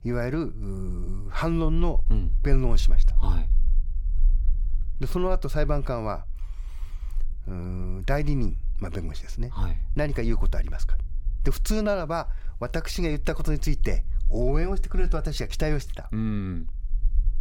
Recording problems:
low rumble; faint; throughout; 25 dB below the speech

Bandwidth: 17.5 kHz